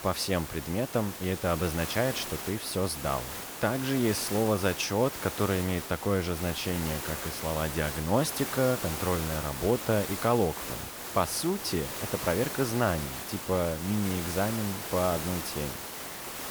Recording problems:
hiss; loud; throughout; 6 dB below the speech

